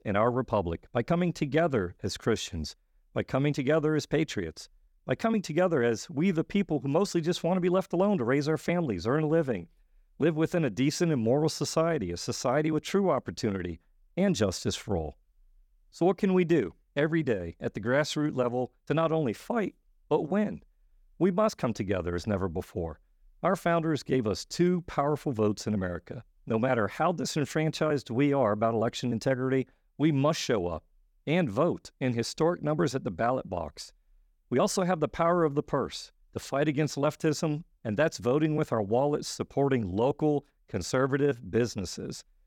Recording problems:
none

